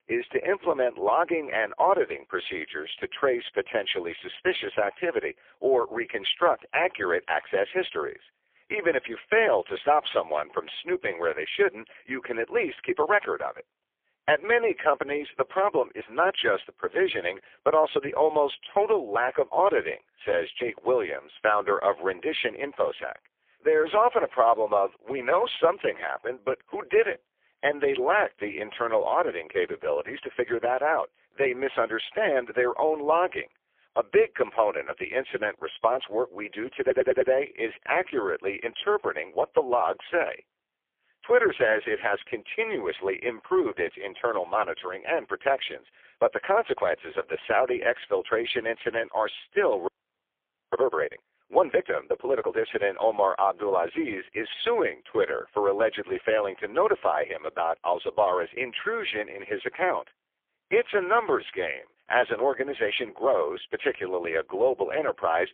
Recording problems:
phone-call audio; poor line; nothing above 3.5 kHz
audio stuttering; at 37 s
audio freezing; at 50 s for 1 s

